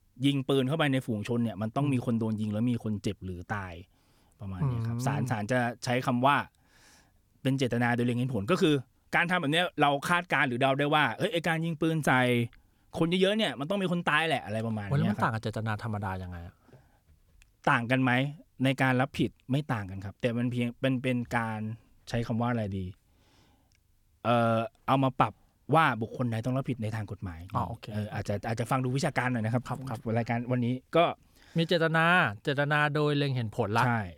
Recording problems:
none

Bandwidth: 18.5 kHz